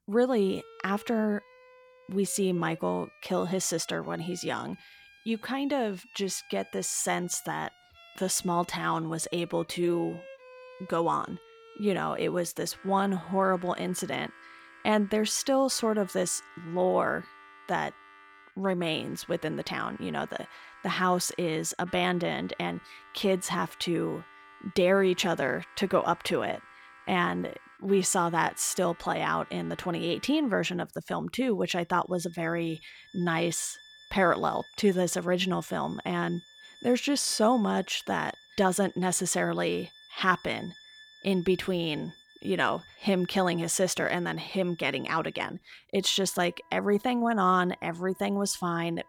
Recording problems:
background music; faint; throughout; 25 dB below the speech

